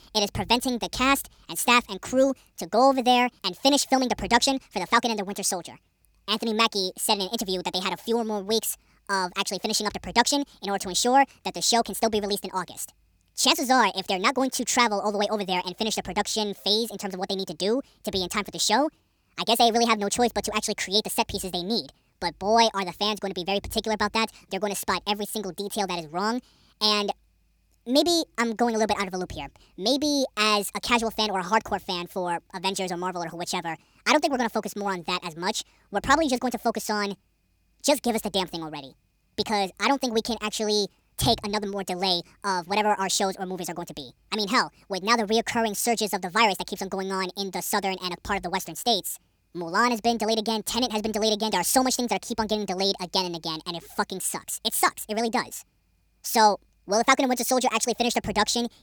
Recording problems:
wrong speed and pitch; too fast and too high; 1.5 times normal speed

